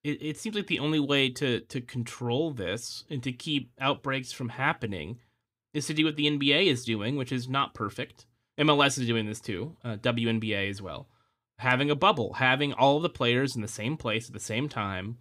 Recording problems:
none

